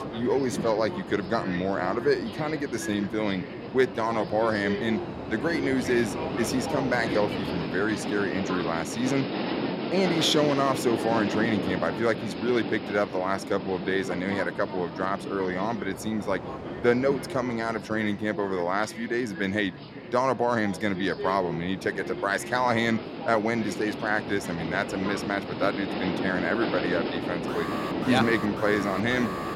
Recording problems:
train or aircraft noise; loud; throughout; 6 dB below the speech
alarm; noticeable; from 27 s on; peak 8 dB below the speech

